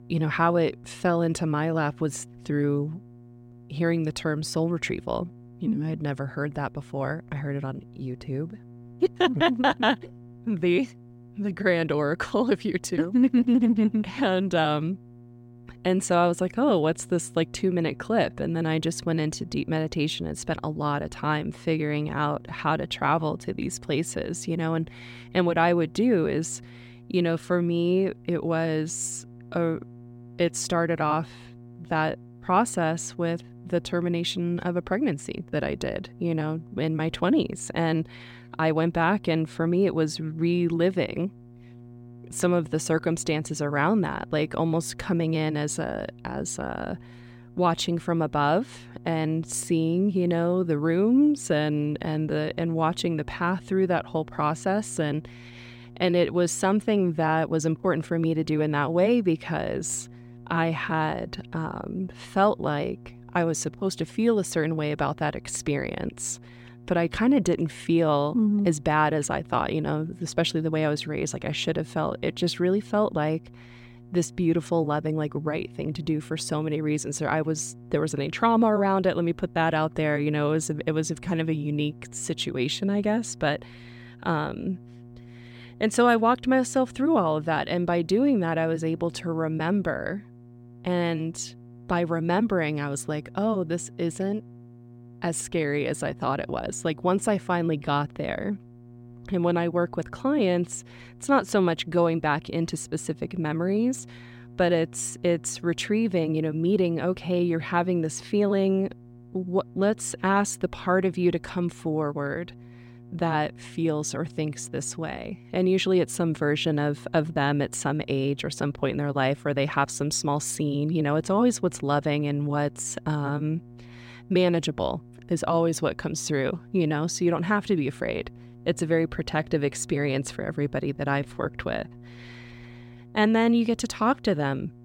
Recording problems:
electrical hum; faint; throughout; 60 Hz, 25 dB below the speech

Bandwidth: 16 kHz